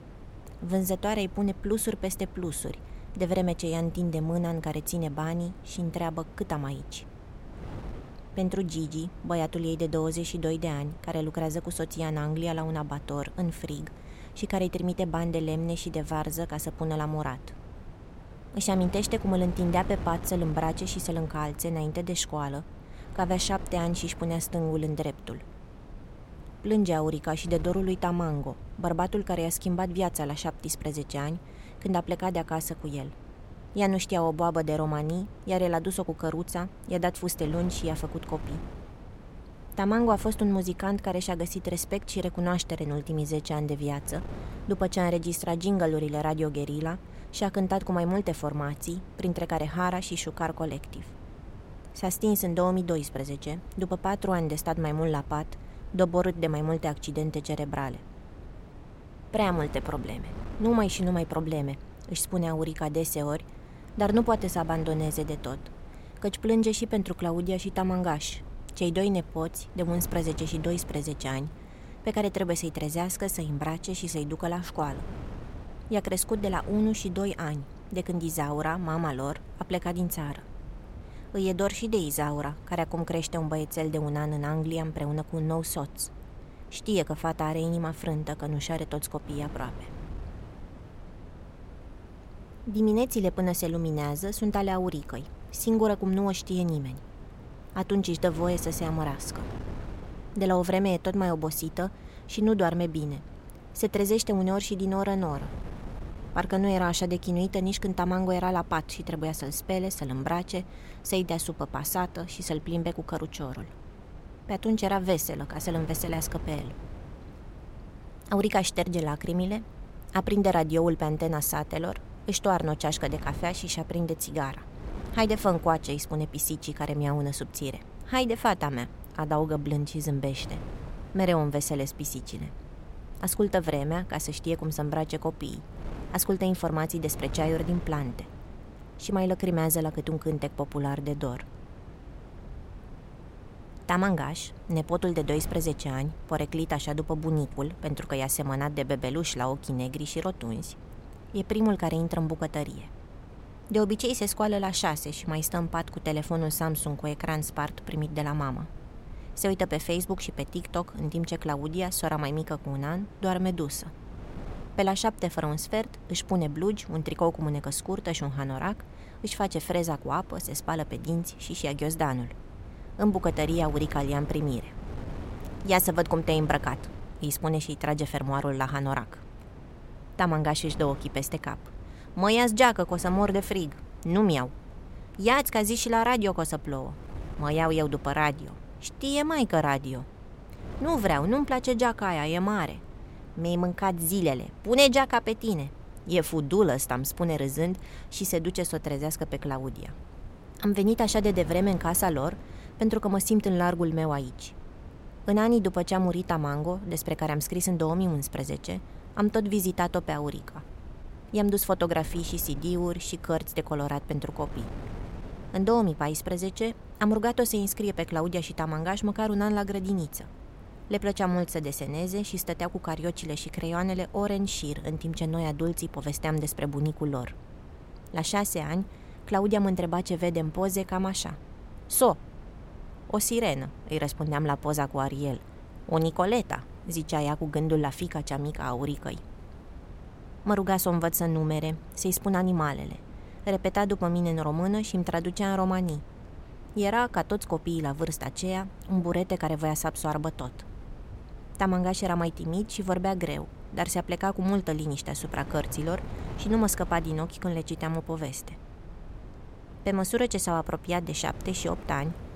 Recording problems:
wind noise on the microphone; occasional gusts; 20 dB below the speech

